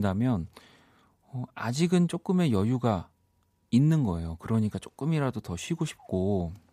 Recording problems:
abrupt cut into speech; at the start

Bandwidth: 15 kHz